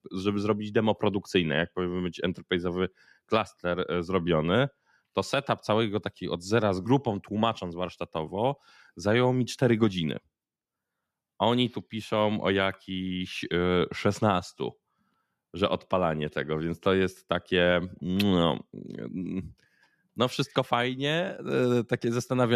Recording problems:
abrupt cut into speech; at the end

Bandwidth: 14.5 kHz